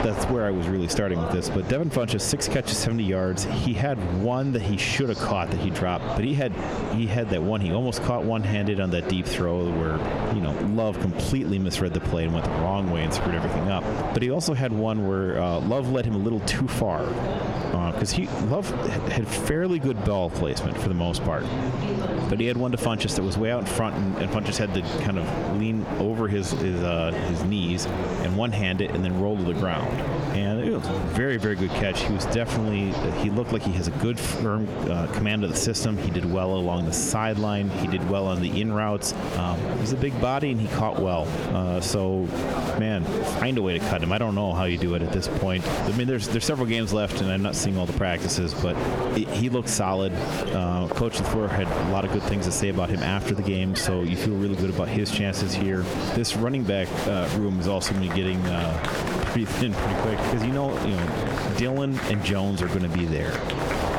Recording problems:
squashed, flat; heavily, background pumping
wind noise on the microphone; heavy; 8 dB below the speech
murmuring crowd; loud; throughout; 7 dB below the speech

